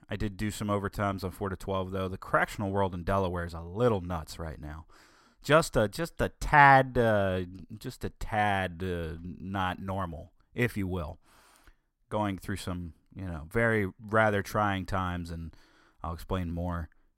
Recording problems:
uneven, jittery; slightly; from 1 to 13 s

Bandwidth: 16 kHz